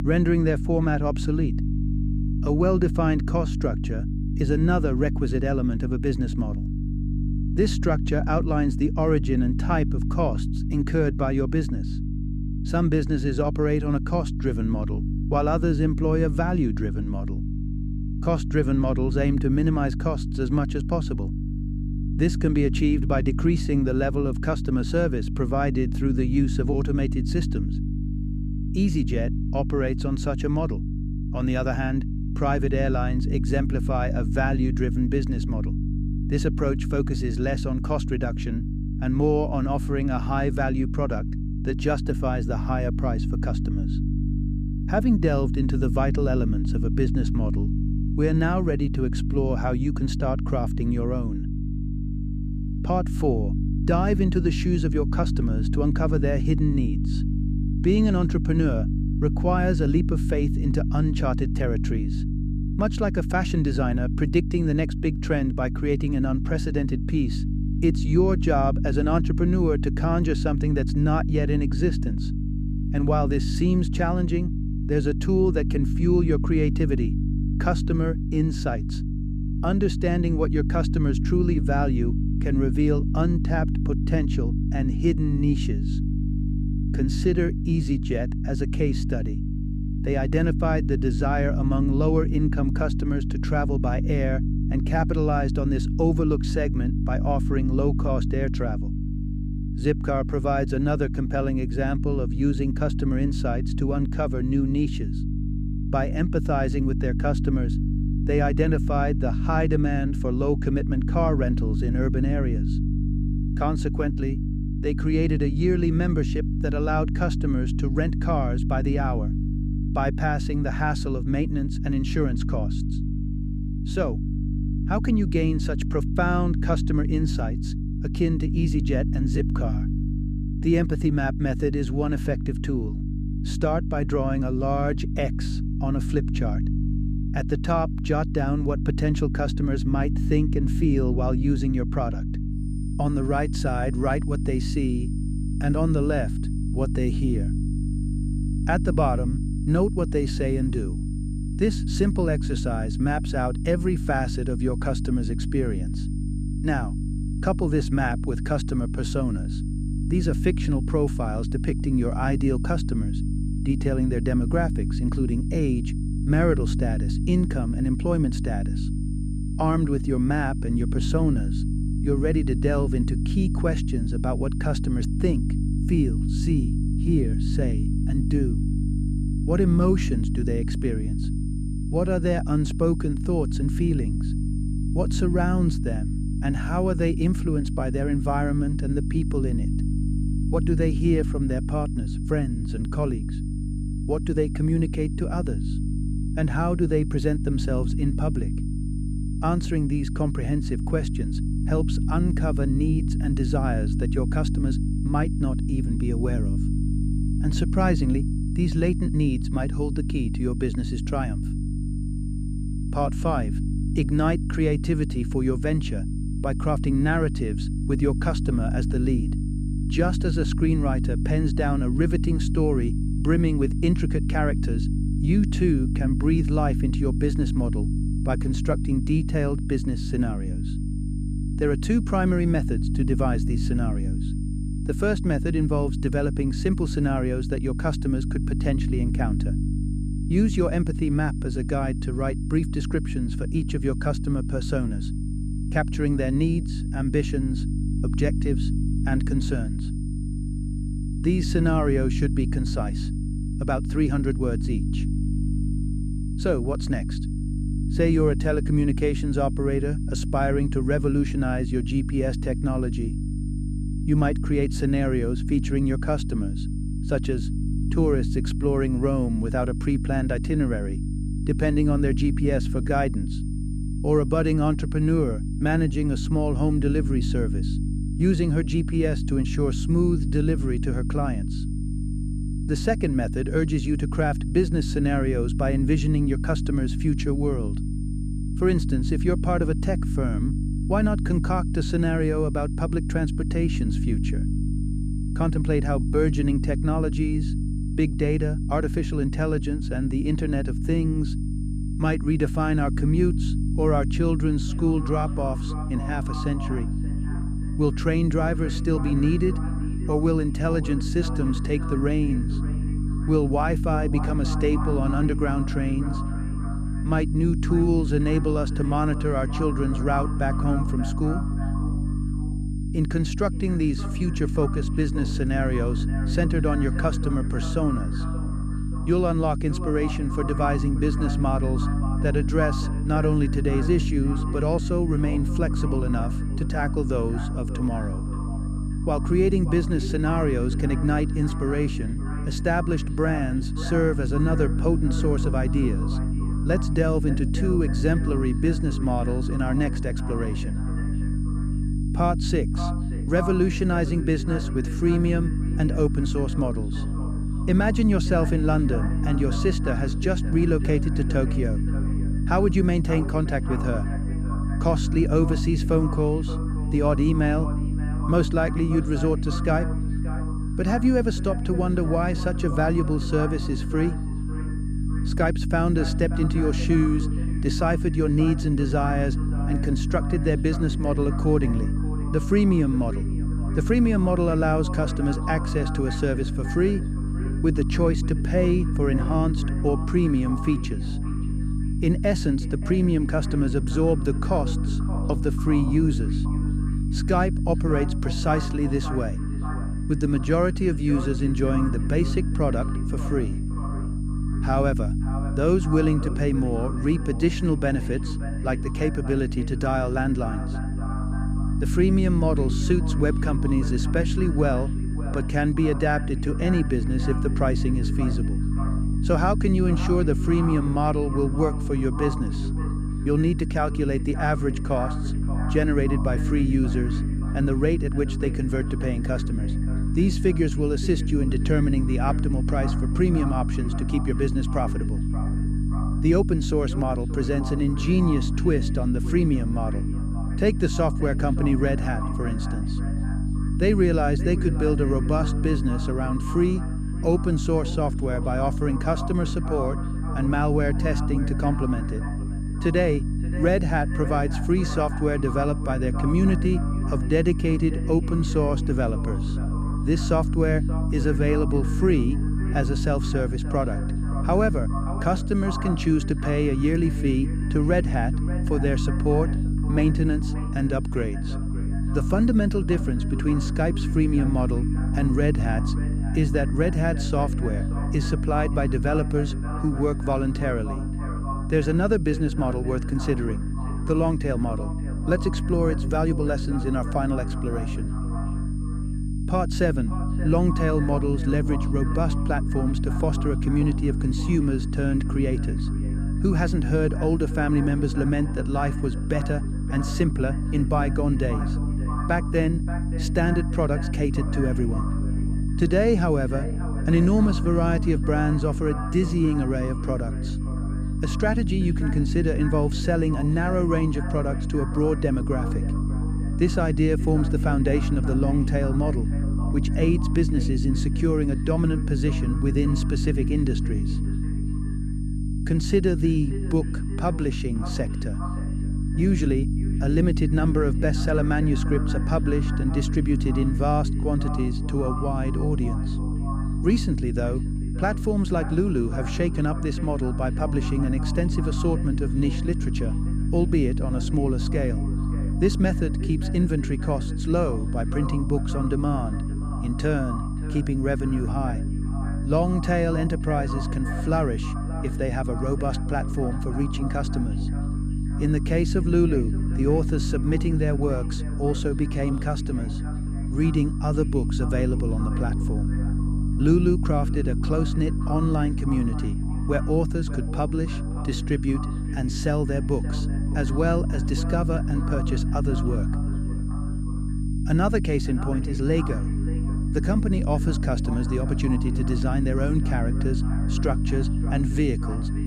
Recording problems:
echo of what is said; noticeable; from 5:05 on; 580 ms later, 15 dB below the speech
electrical hum; loud; throughout; 50 Hz, 9 dB below the speech
high-pitched whine; faint; from 2:23 on; 9 kHz, 25 dB below the speech

